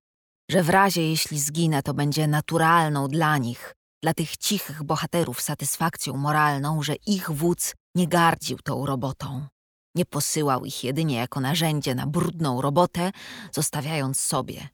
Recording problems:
none

